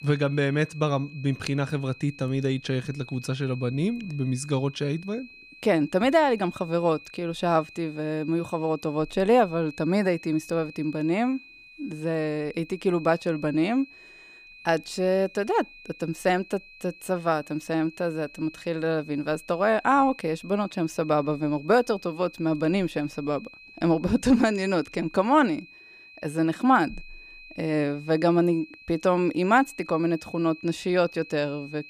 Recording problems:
high-pitched whine; noticeable; throughout; 2.5 kHz, 20 dB below the speech

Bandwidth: 15 kHz